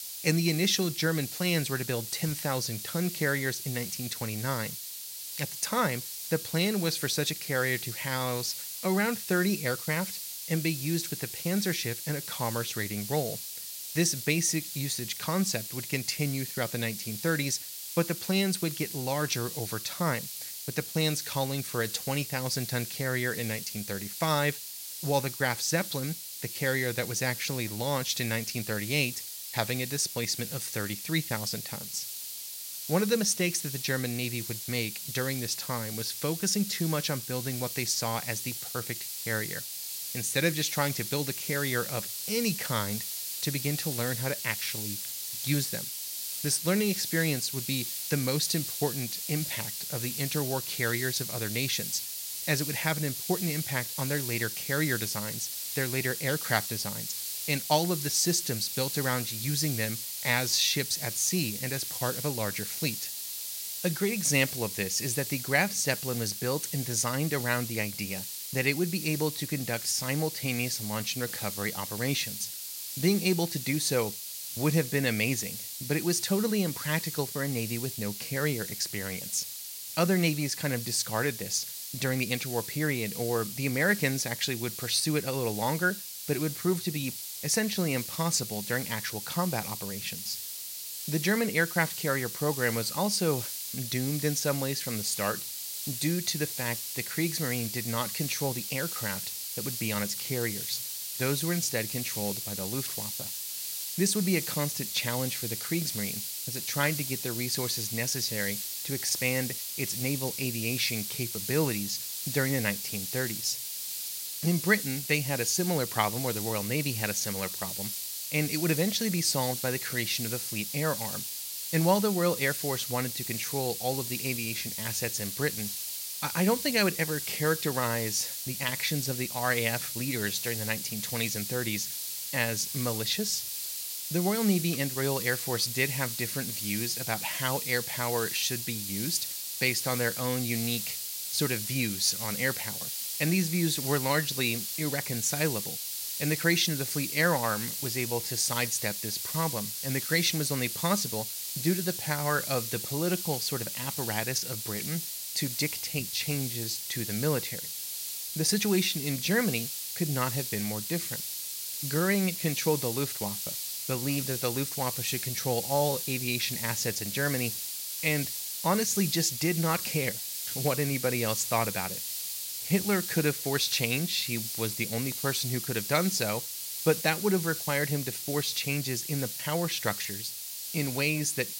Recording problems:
hiss; loud; throughout; 4 dB below the speech

